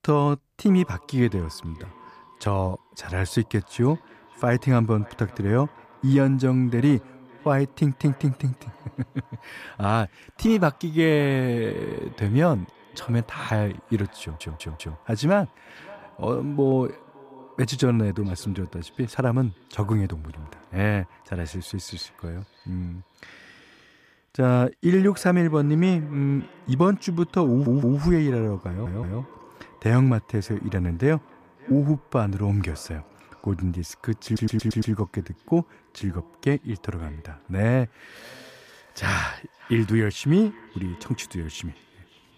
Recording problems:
echo of what is said; faint; throughout; 570 ms later, 25 dB below the speech
audio stuttering; 4 times, first at 14 s

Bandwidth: 14.5 kHz